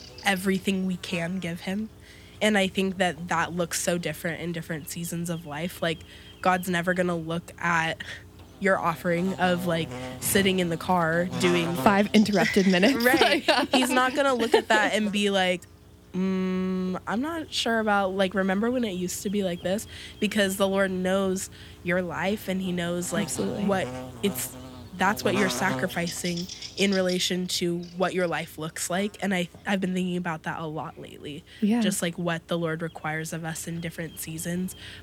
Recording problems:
electrical hum; noticeable; throughout; 60 Hz, 15 dB below the speech

